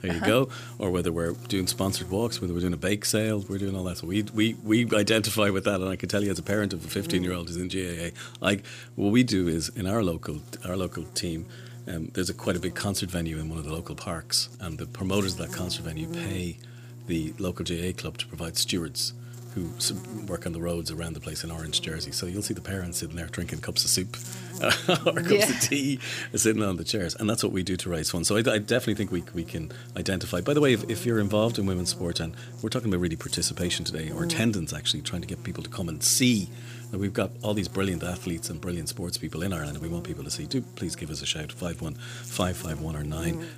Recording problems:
electrical hum; noticeable; throughout; 60 Hz, 20 dB below the speech

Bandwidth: 15 kHz